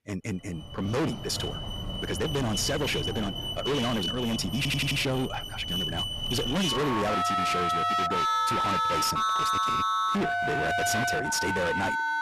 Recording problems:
distortion; heavy; 29% of the sound clipped
wrong speed, natural pitch; too fast; 1.7 times normal speed
alarms or sirens; very loud; throughout; 2 dB above the speech
audio stuttering; at 4.5 s

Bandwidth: 13.5 kHz